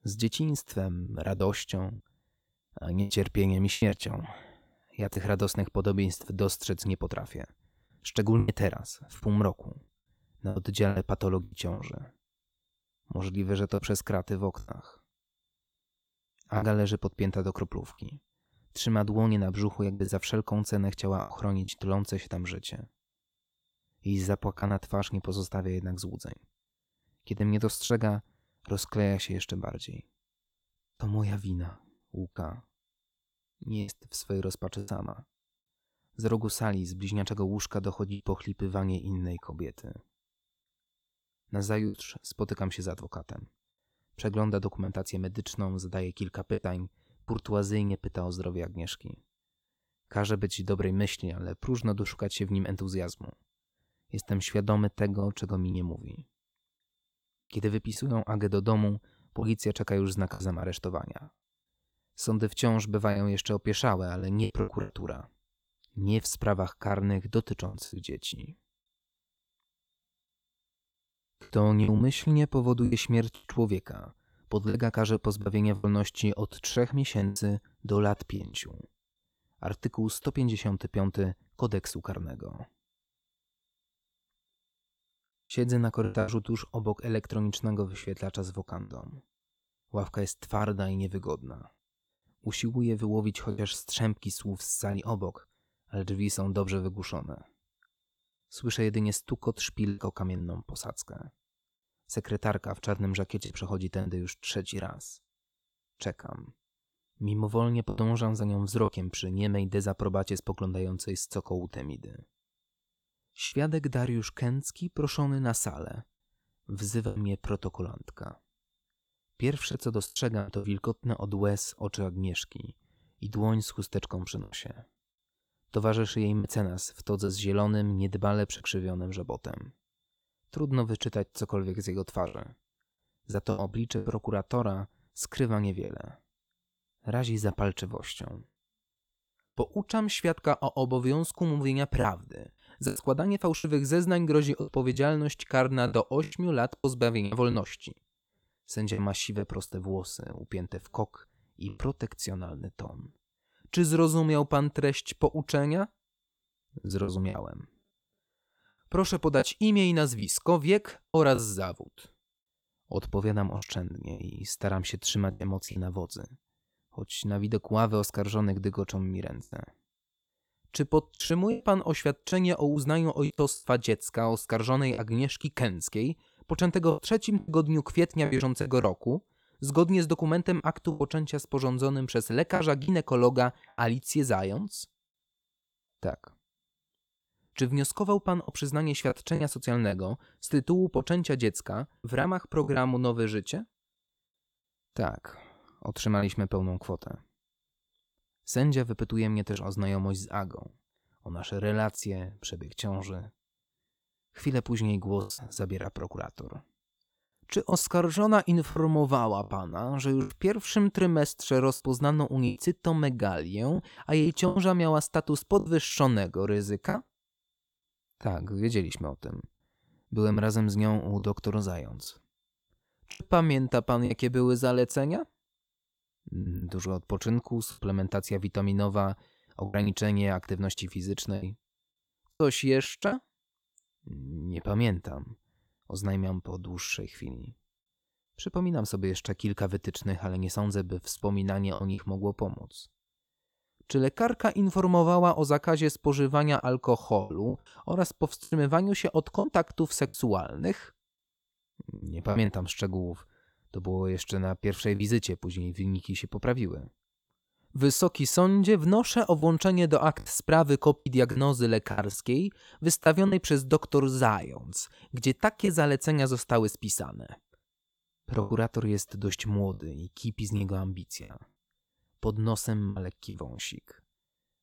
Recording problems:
choppy; occasionally; 5% of the speech affected

